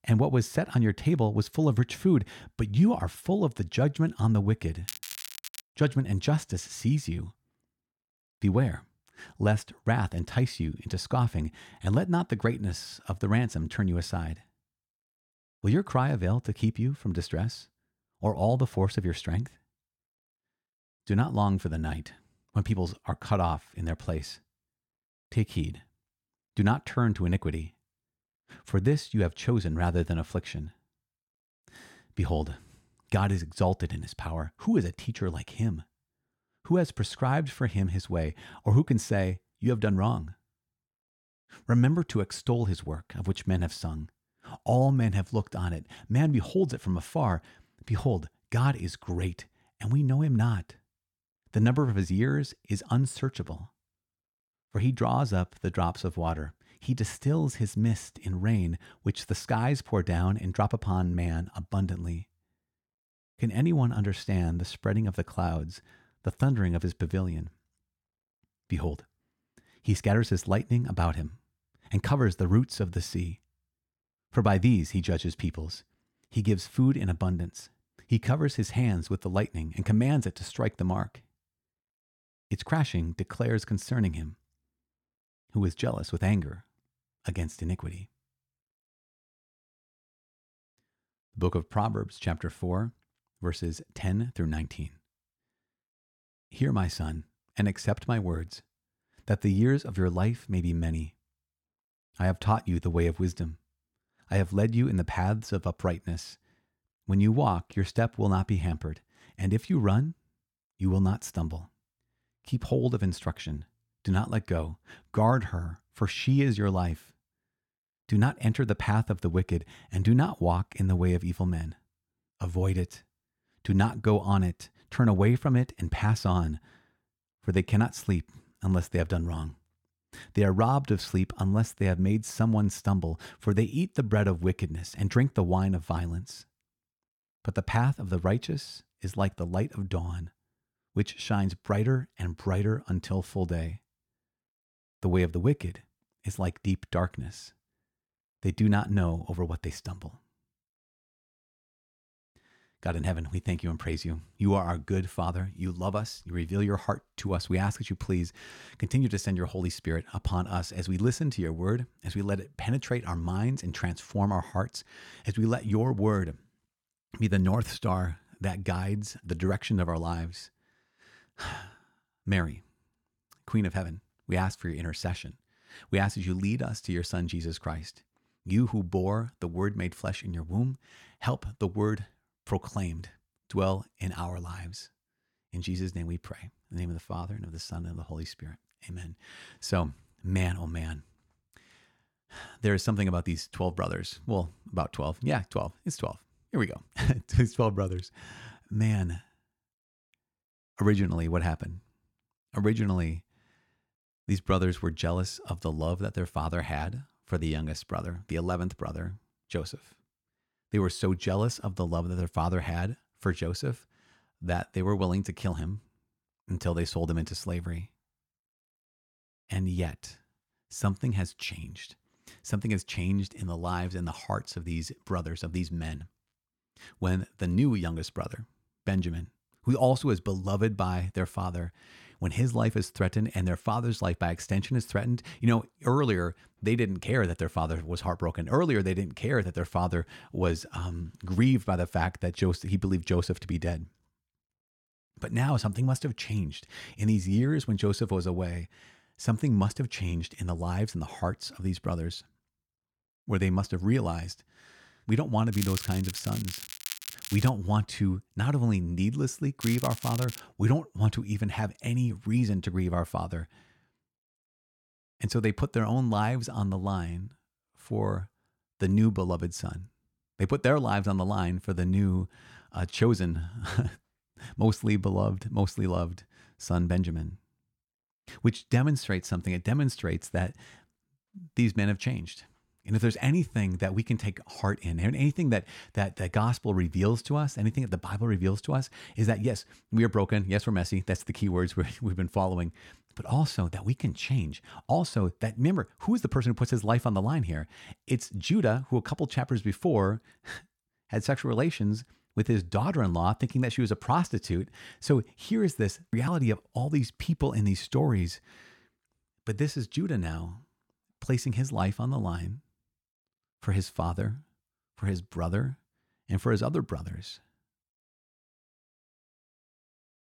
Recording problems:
crackling; loud; at 5 s, from 4:16 to 4:18 and at 4:20; 9 dB below the speech

